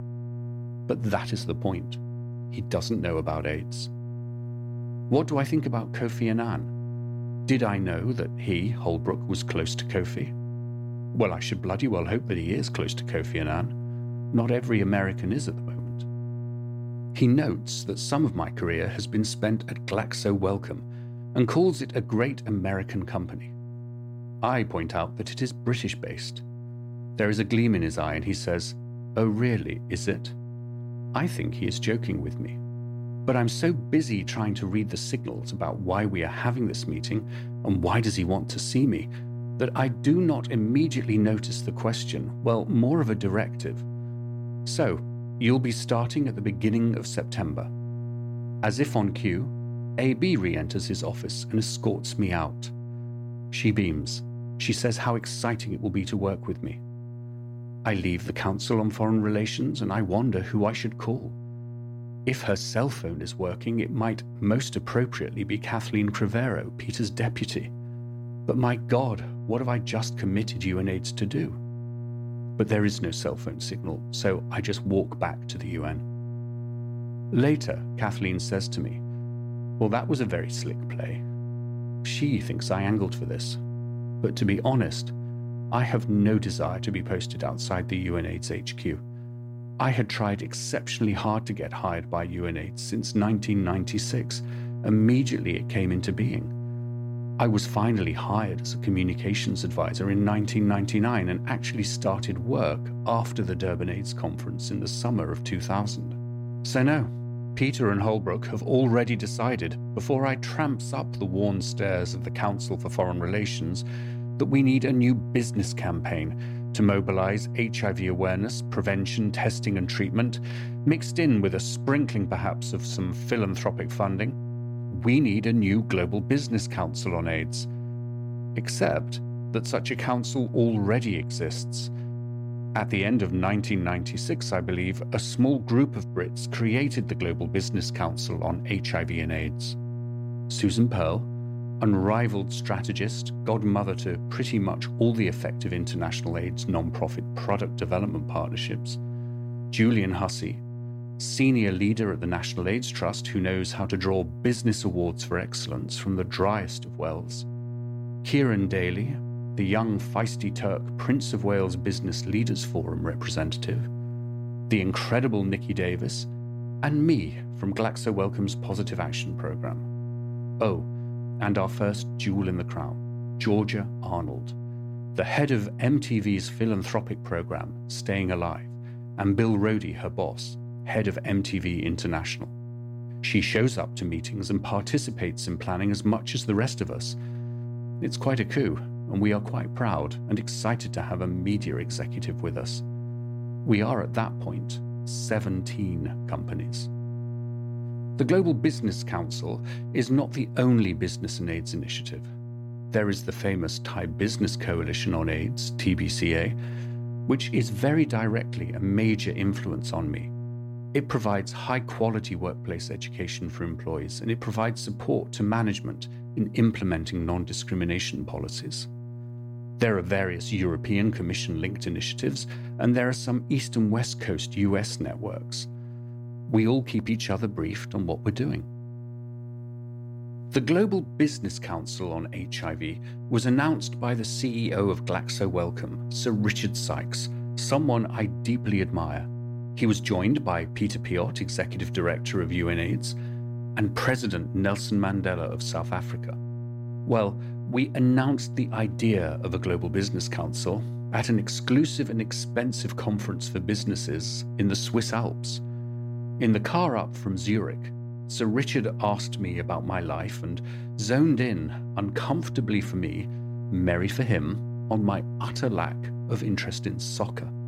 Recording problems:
electrical hum; noticeable; throughout; 60 Hz, 15 dB below the speech

